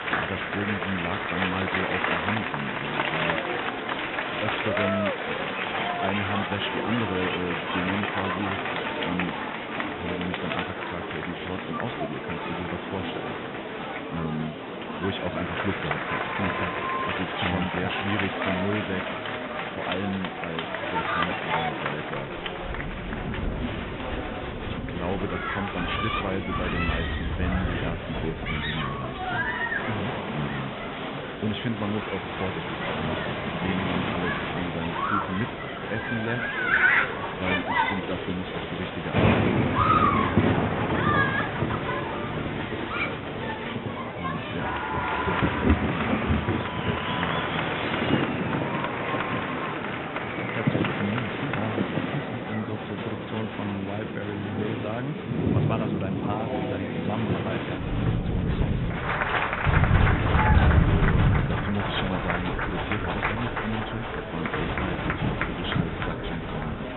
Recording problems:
high frequencies cut off; severe; nothing above 4 kHz
crowd noise; very loud; throughout; 4 dB above the speech
rain or running water; very loud; from 22 s on; 4 dB above the speech
murmuring crowd; loud; throughout; 3 dB below the speech

